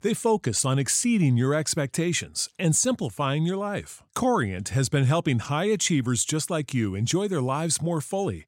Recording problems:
none

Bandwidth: 16 kHz